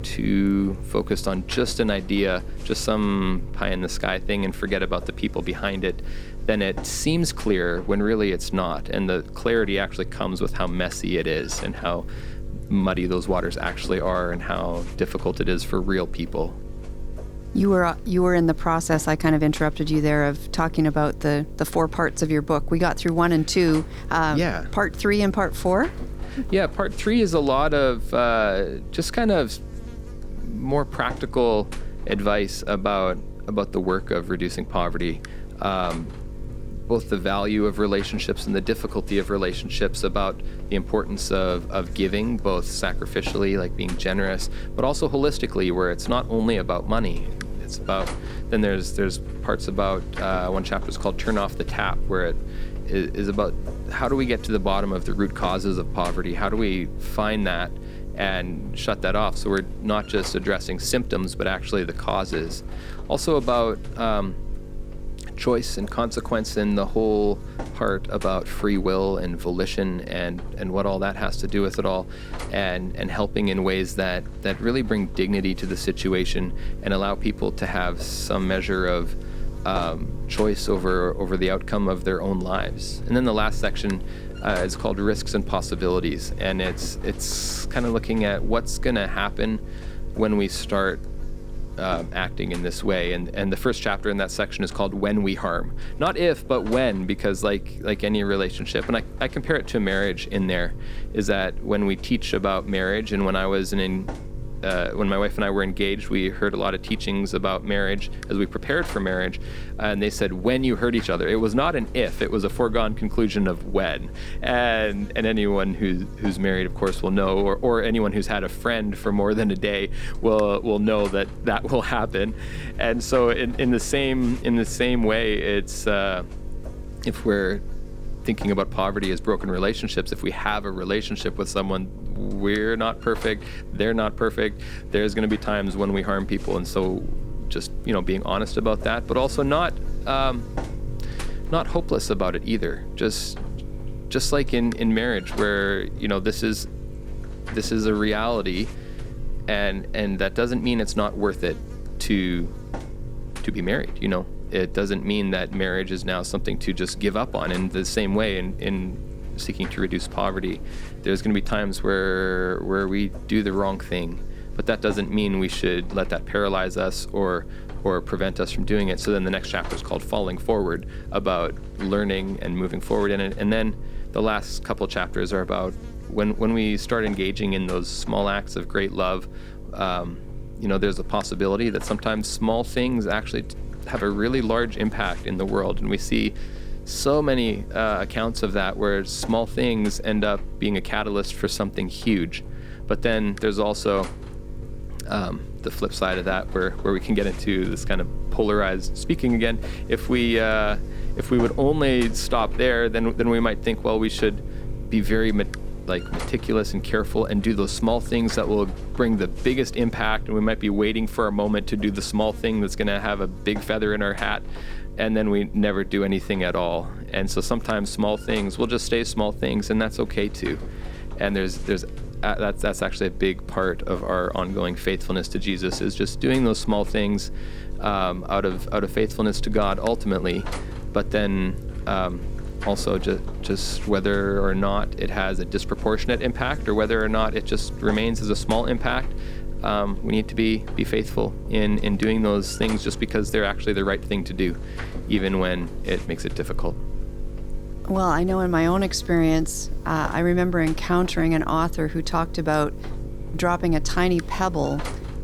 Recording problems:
electrical hum; noticeable; throughout; 50 Hz, 15 dB below the speech

